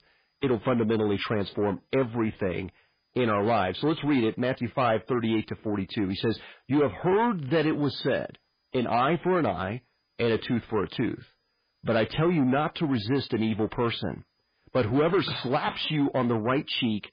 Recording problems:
garbled, watery; badly; nothing above 4.5 kHz
distortion; slight; 10 dB below the speech

